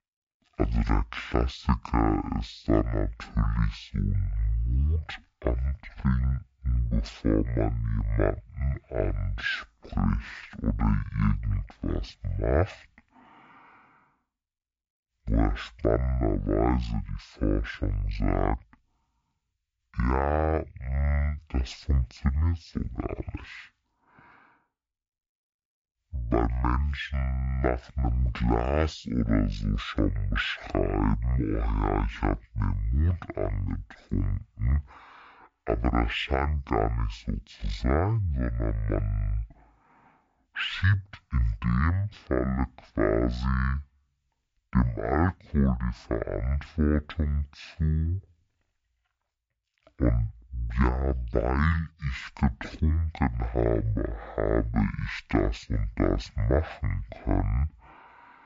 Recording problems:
wrong speed and pitch; too slow and too low; 0.5 times normal speed

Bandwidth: 7.5 kHz